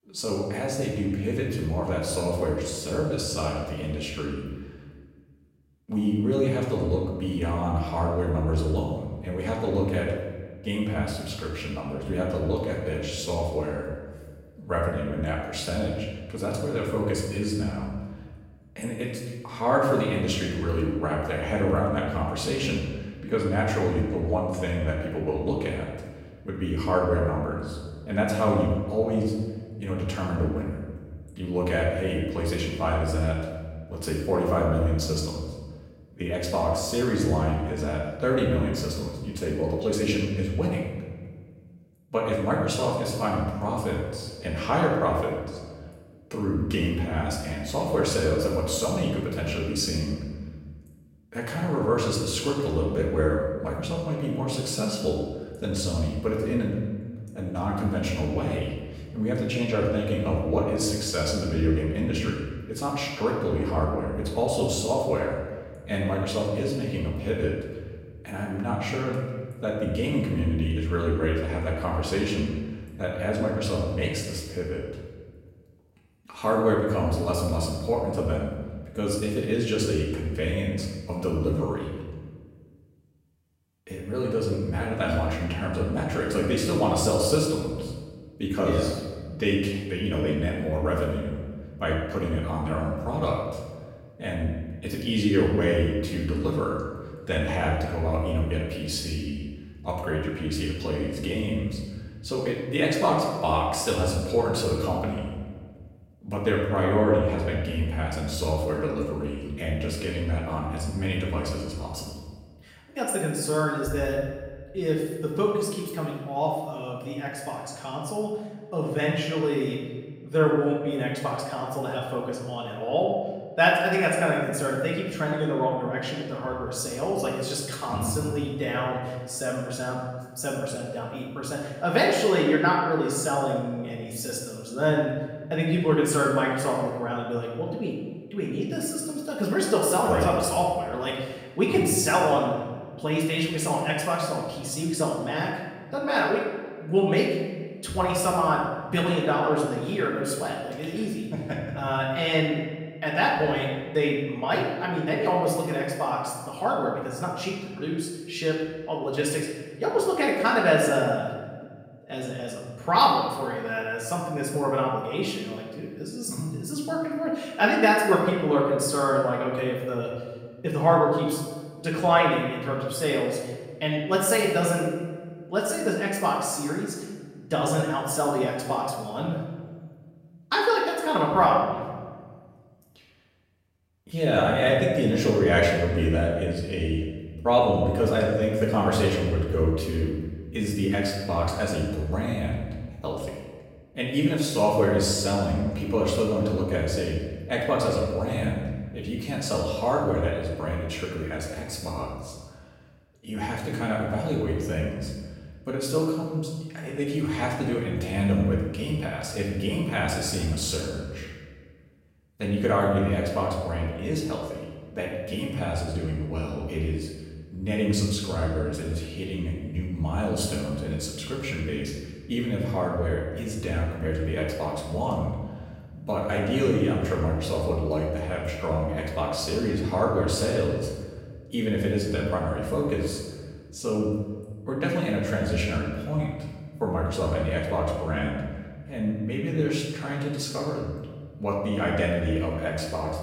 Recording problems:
off-mic speech; far
room echo; noticeable; dies away in 1.2 s

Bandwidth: 16 kHz